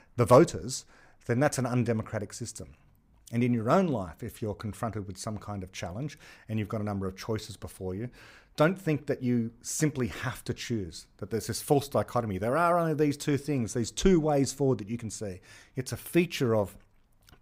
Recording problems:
none

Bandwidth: 15.5 kHz